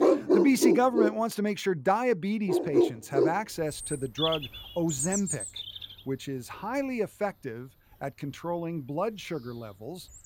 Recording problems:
animal sounds; very loud; throughout; 2 dB above the speech

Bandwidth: 17 kHz